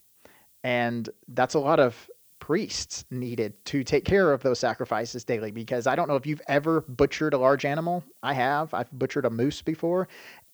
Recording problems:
high frequencies cut off; noticeable; nothing above 8 kHz
hiss; faint; throughout; 30 dB below the speech

